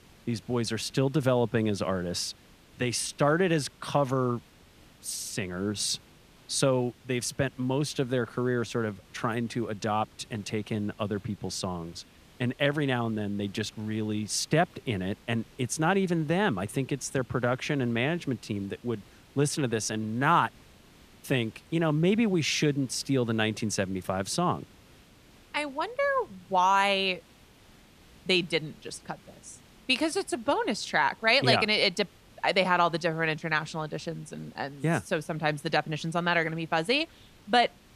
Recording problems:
hiss; faint; throughout; 25 dB below the speech

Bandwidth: 14.5 kHz